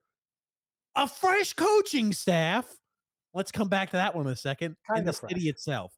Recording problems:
none

